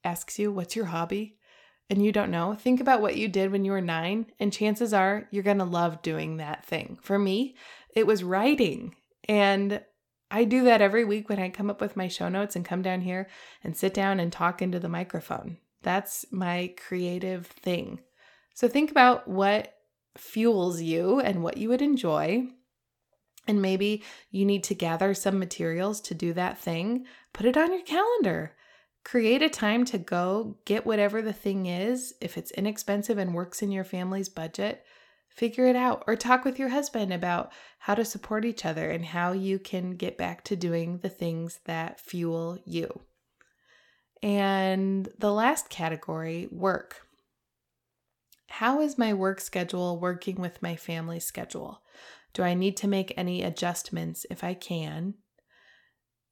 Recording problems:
none

